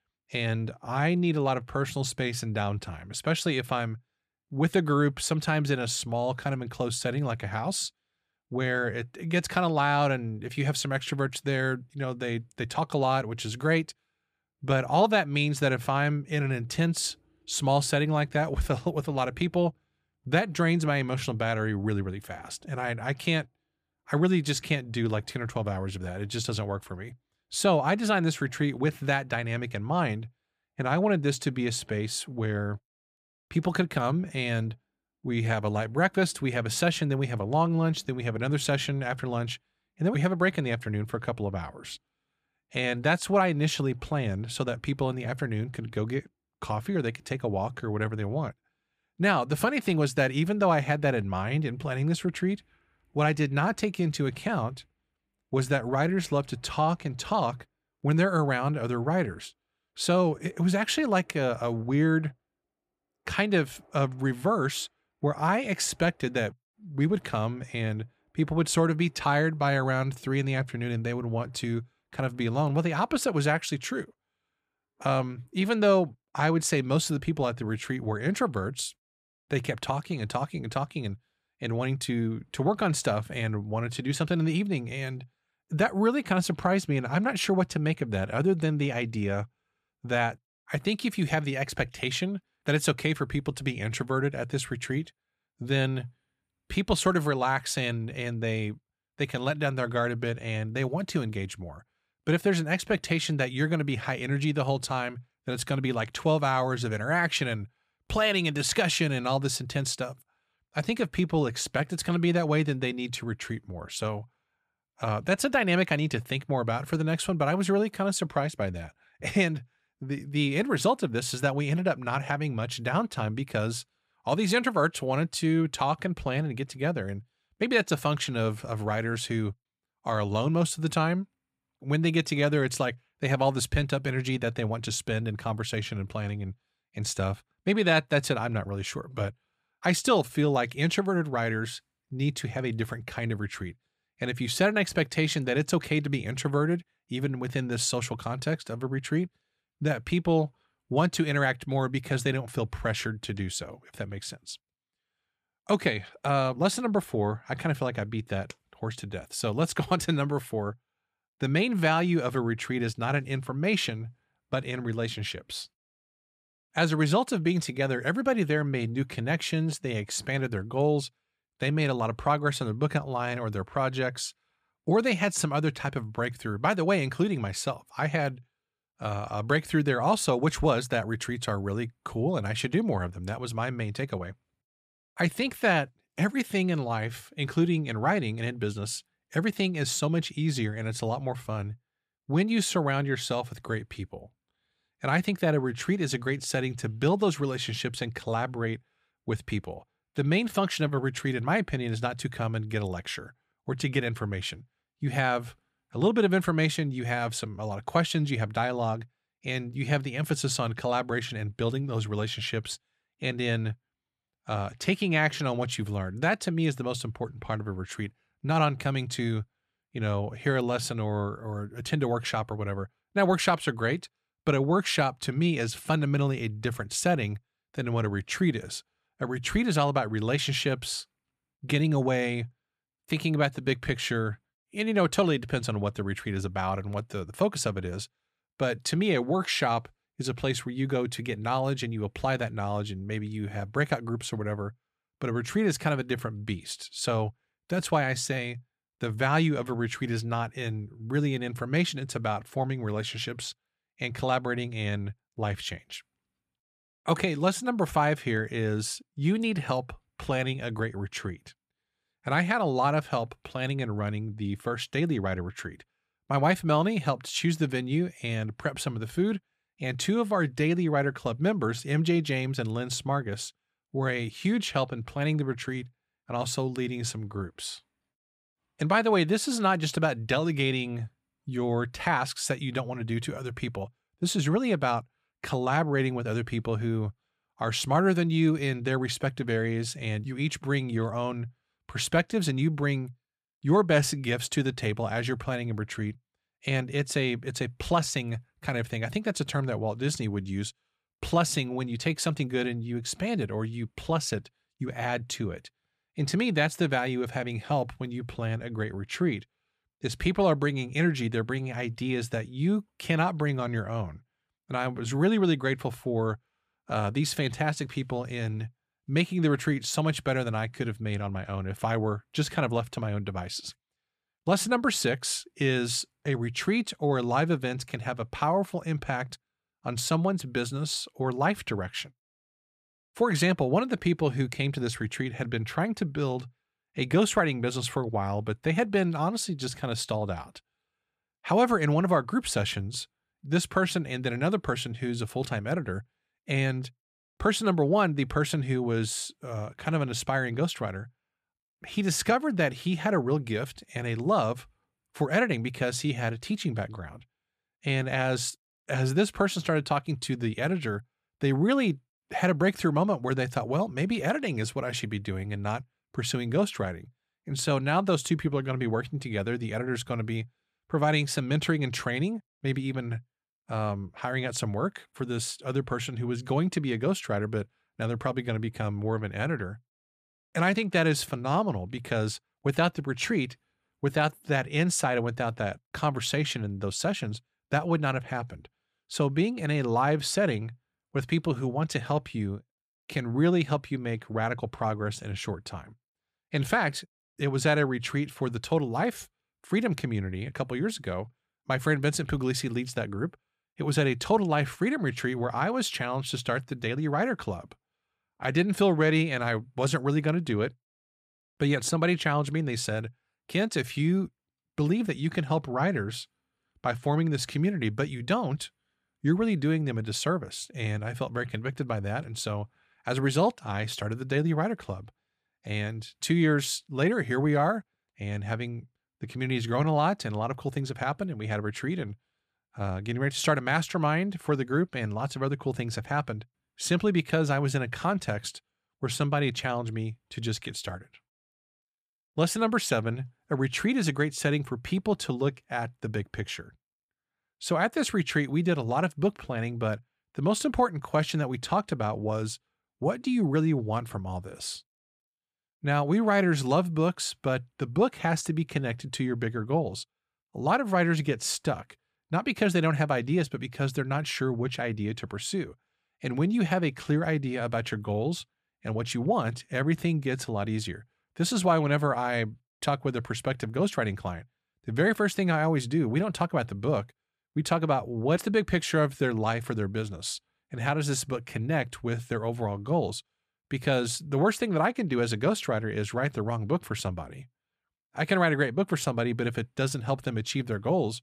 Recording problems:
none

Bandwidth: 15 kHz